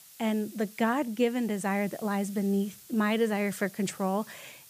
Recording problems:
hiss; noticeable; throughout; 20 dB below the speech

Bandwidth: 15 kHz